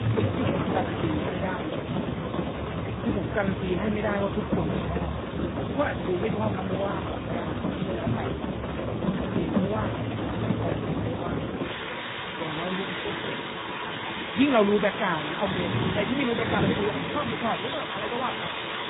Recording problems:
garbled, watery; badly; nothing above 4 kHz
rain or running water; very loud; throughout; as loud as the speech

